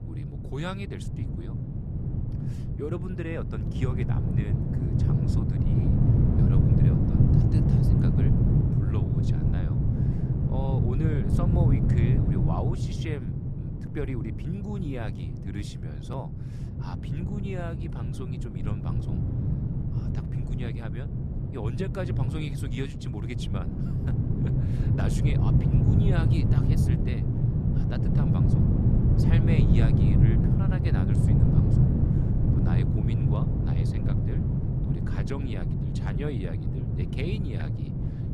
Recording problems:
wind noise on the microphone; heavy; 4 dB above the speech

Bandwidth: 14 kHz